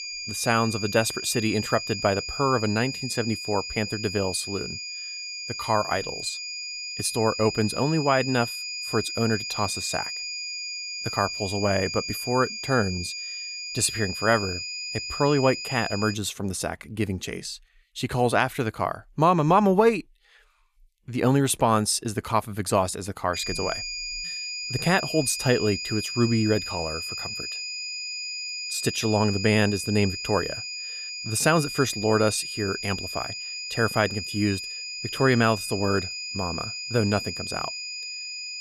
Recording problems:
high-pitched whine; loud; until 16 s and from 23 s on; 5 kHz, 6 dB below the speech

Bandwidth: 14.5 kHz